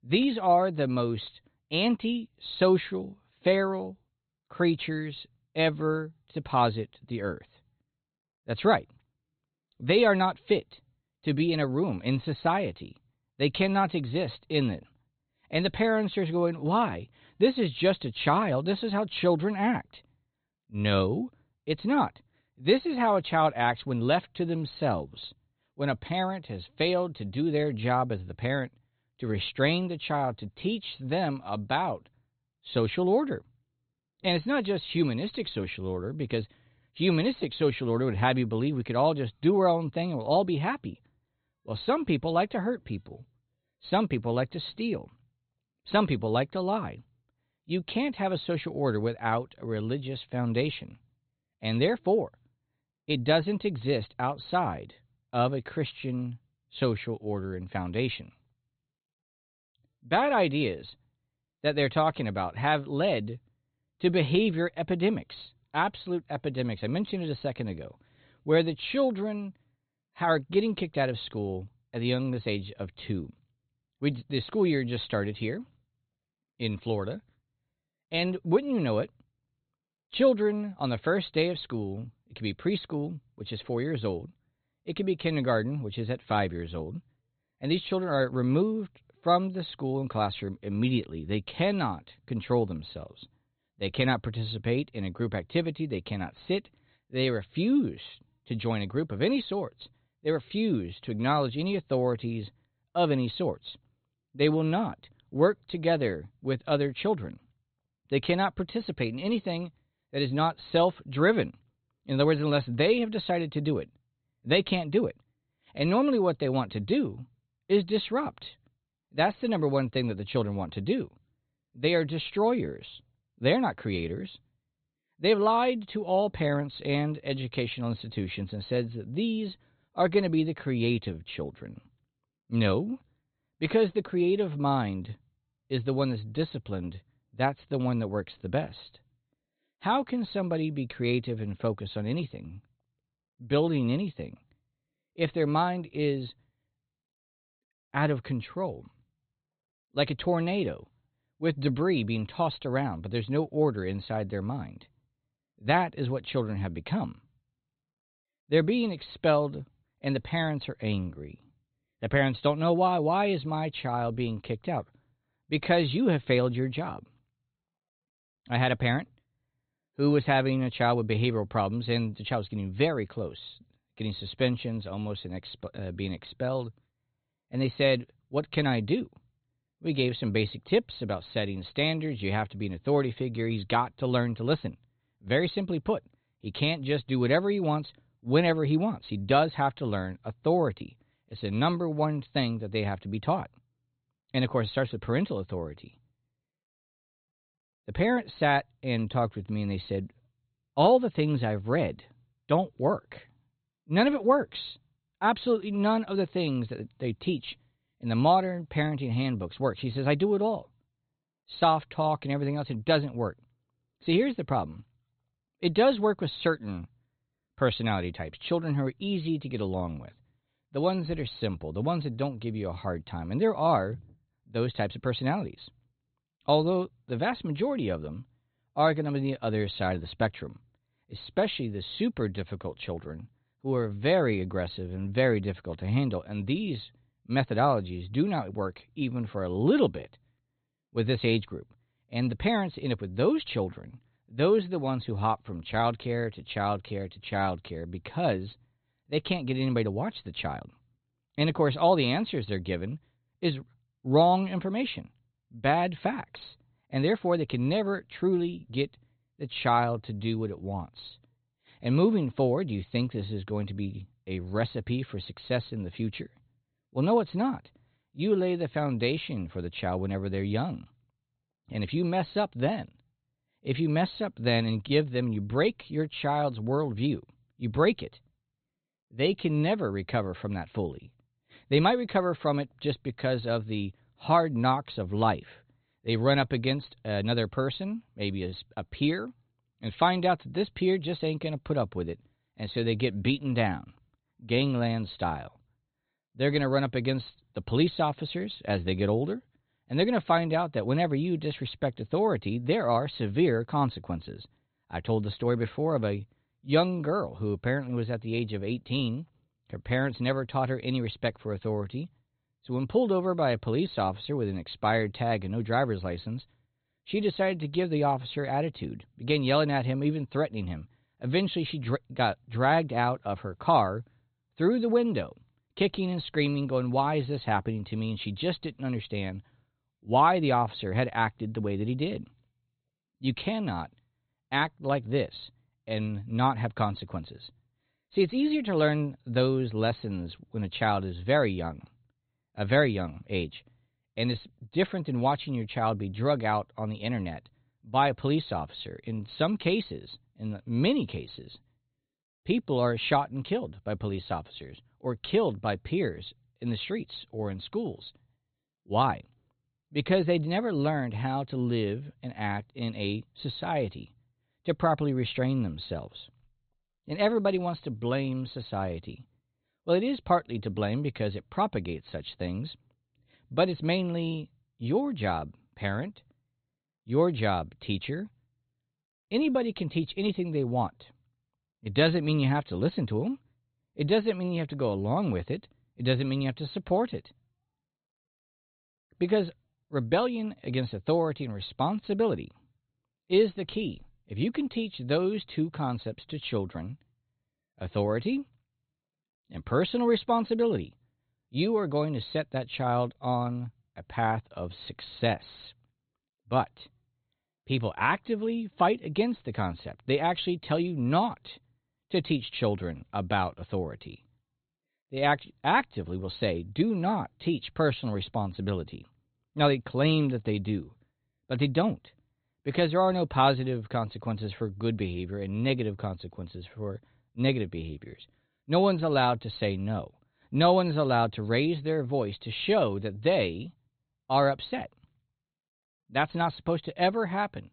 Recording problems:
high frequencies cut off; severe; nothing above 4 kHz

